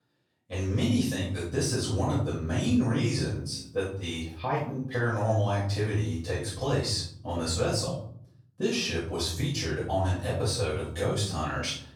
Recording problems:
off-mic speech; far
room echo; noticeable; dies away in 0.7 s

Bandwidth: 18.5 kHz